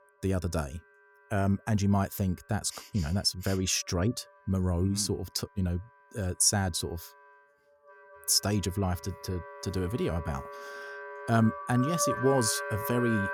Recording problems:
background music; loud; throughout; 8 dB below the speech

